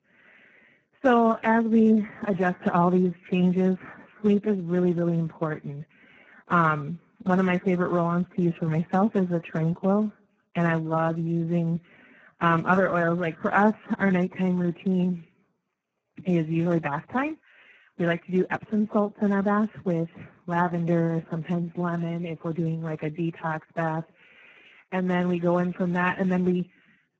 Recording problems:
garbled, watery; badly
muffled; very; fading above 2.5 kHz

